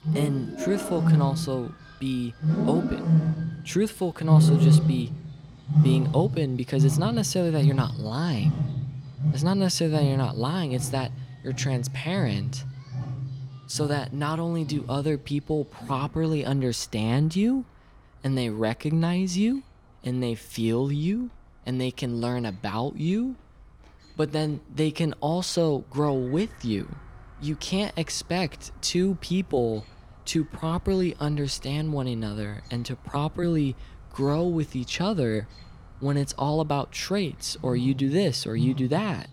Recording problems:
animal sounds; very loud; throughout; 1 dB above the speech

